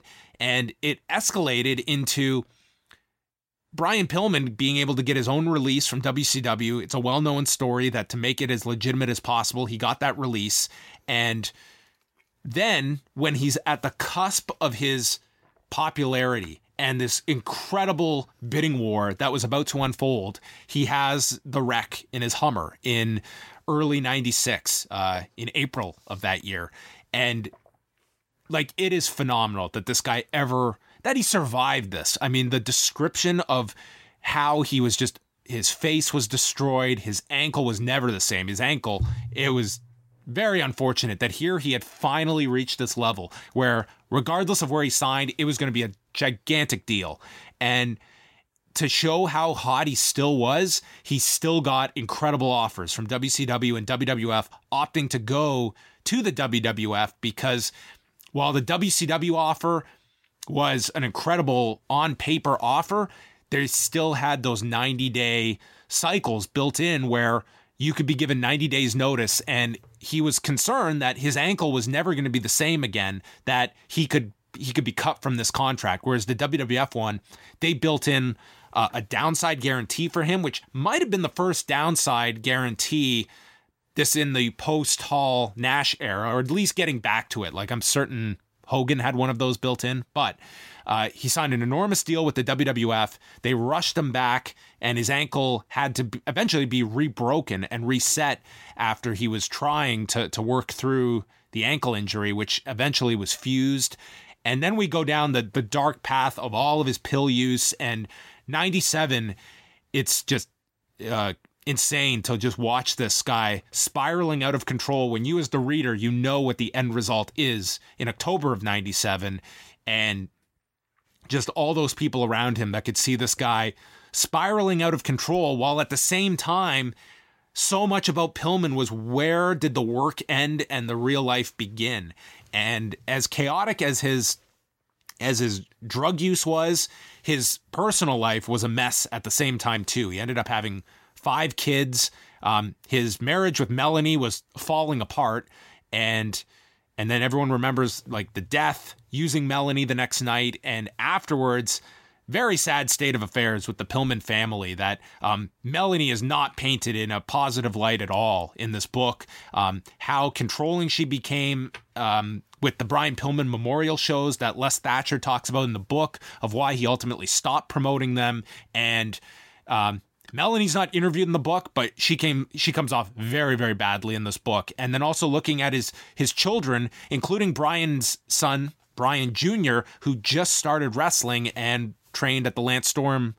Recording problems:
none

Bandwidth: 16 kHz